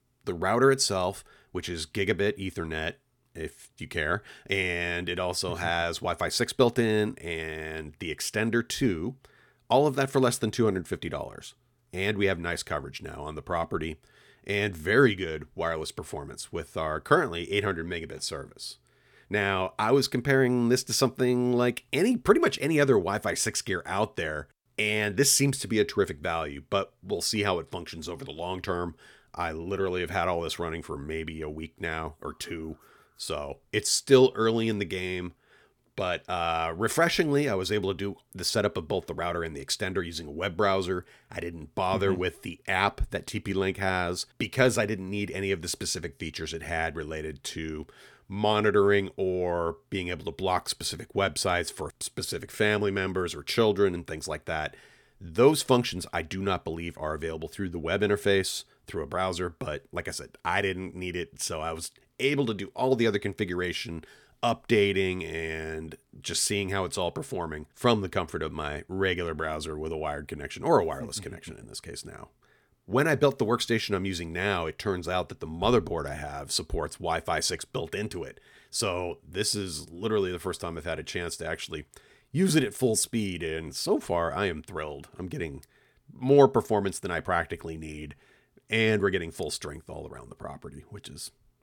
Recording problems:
none

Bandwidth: 18.5 kHz